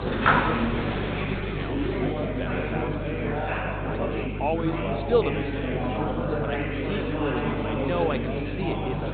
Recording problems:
high frequencies cut off; severe; nothing above 4 kHz
chatter from many people; very loud; throughout; 4 dB above the speech
electrical hum; noticeable; throughout; 50 Hz, 15 dB below the speech

